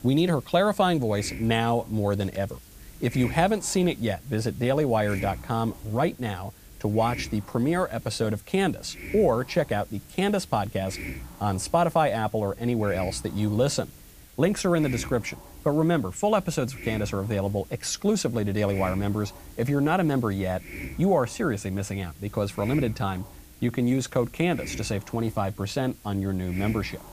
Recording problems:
hiss; noticeable; throughout; 15 dB below the speech

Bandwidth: 15 kHz